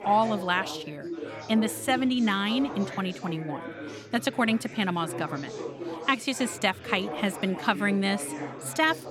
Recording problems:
chatter from many people; noticeable; throughout; 10 dB below the speech

